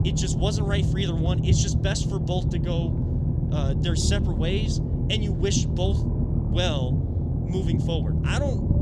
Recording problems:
low rumble; loud; throughout; 4 dB below the speech

